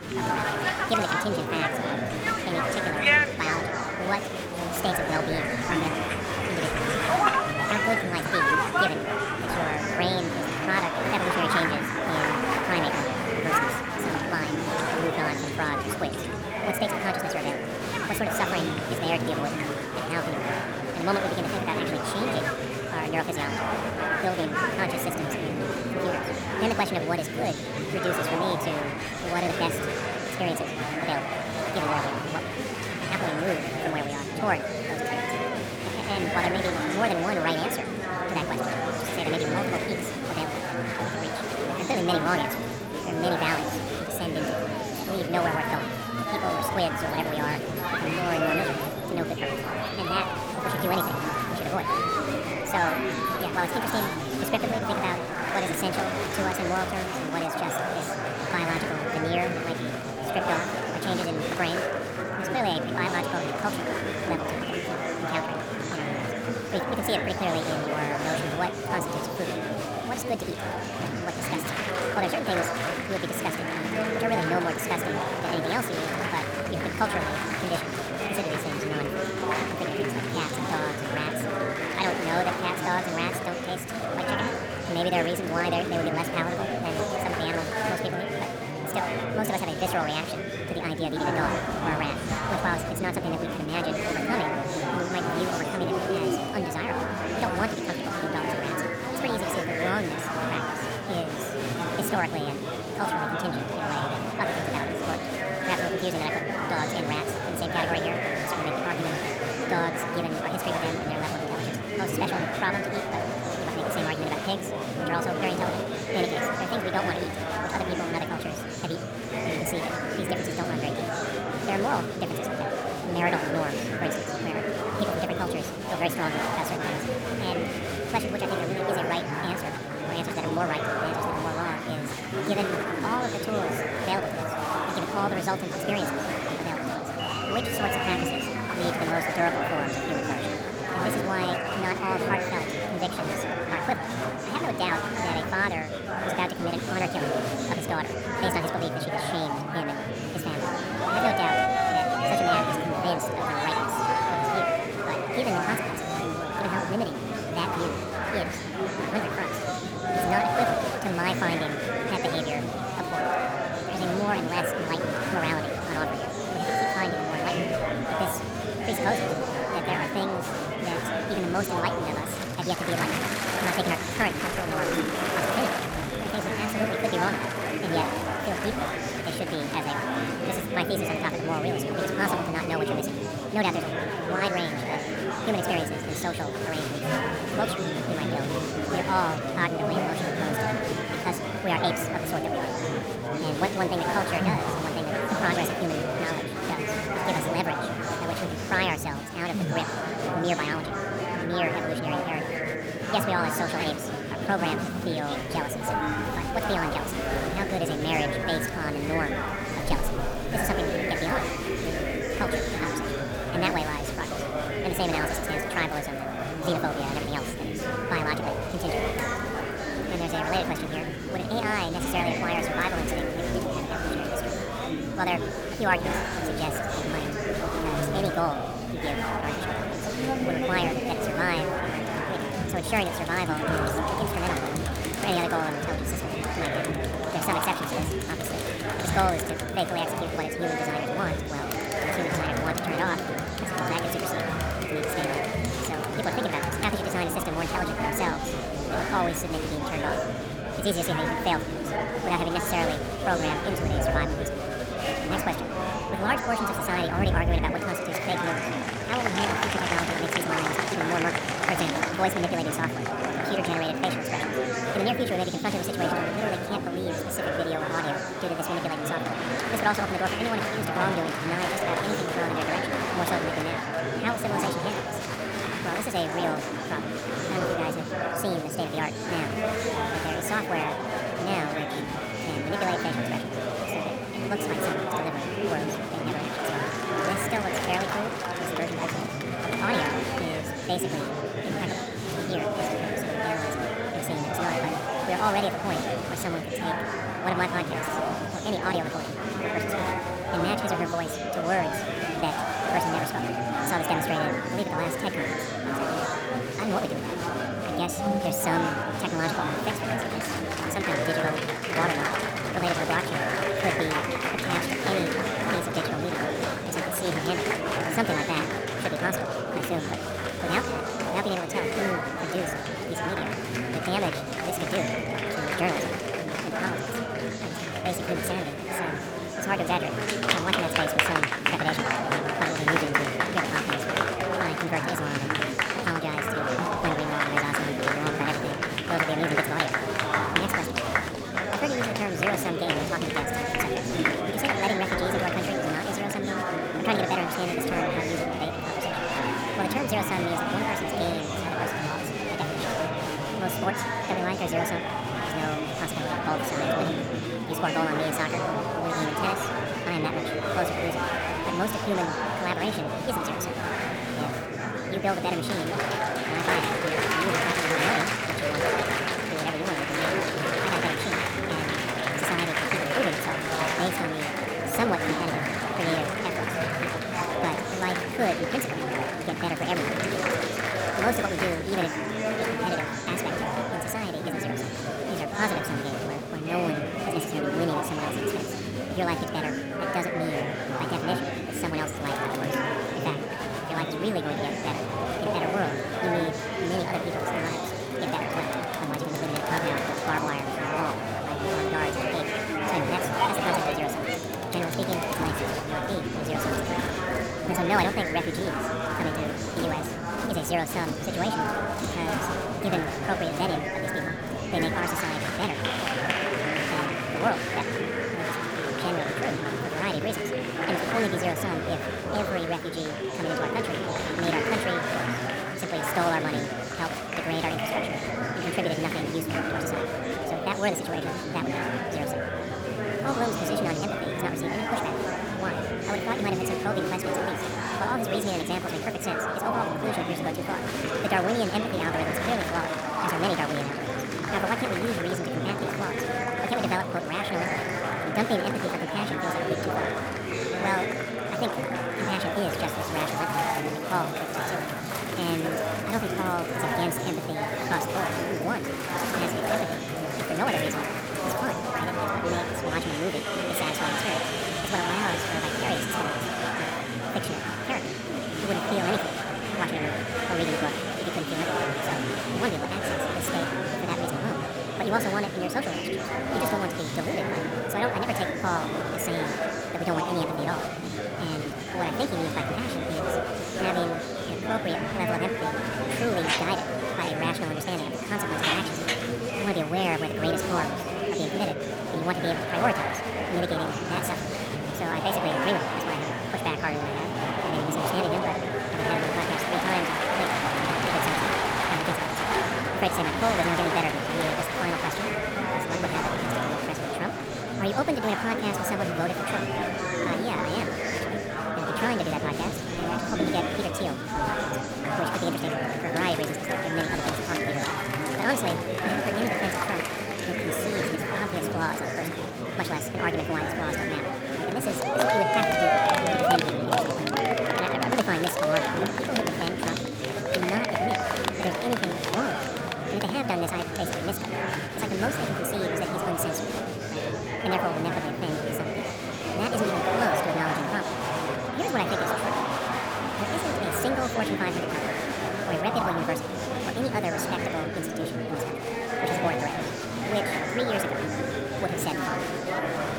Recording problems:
wrong speed and pitch; too fast and too high; 1.7 times normal speed
murmuring crowd; very loud; throughout; 3 dB above the speech

